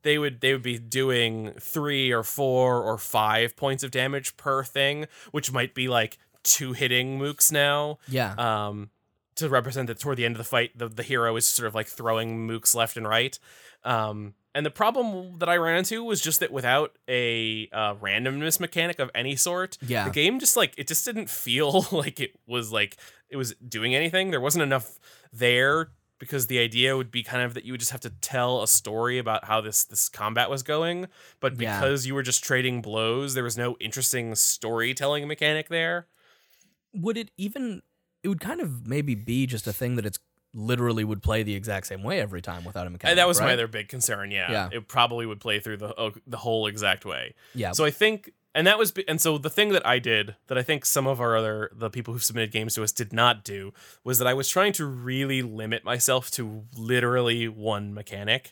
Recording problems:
none

